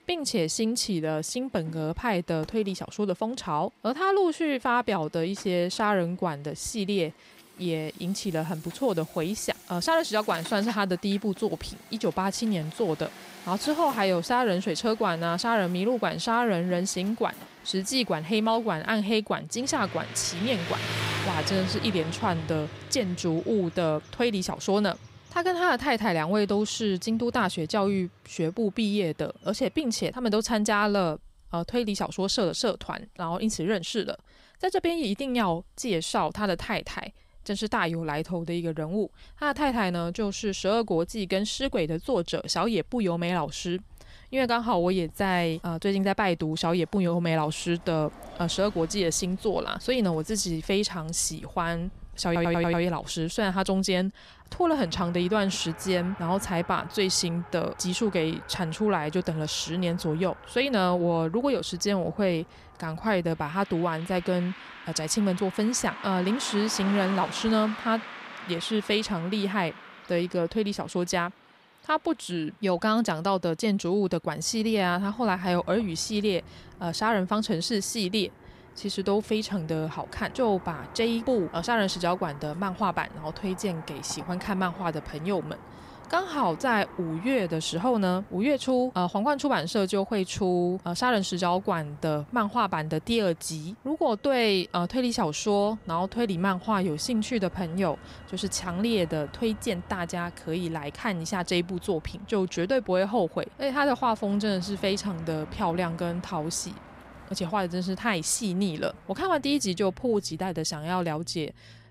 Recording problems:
traffic noise; noticeable; throughout; 15 dB below the speech
audio stuttering; at 52 s

